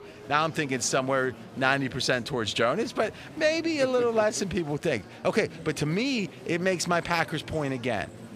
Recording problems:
murmuring crowd; noticeable; throughout; 20 dB below the speech

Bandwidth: 15 kHz